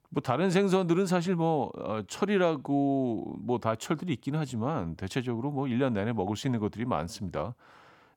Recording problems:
none

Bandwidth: 17.5 kHz